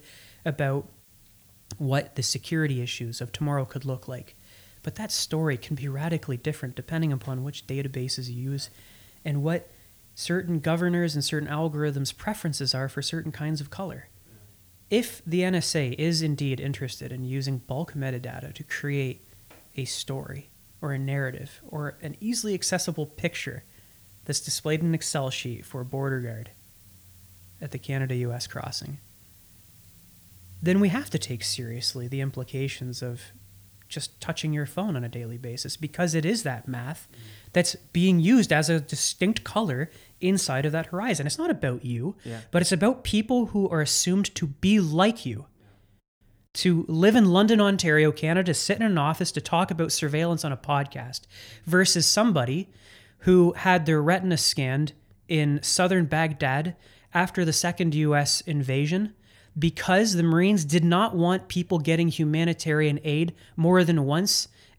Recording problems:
hiss; faint; until 41 s; 30 dB below the speech

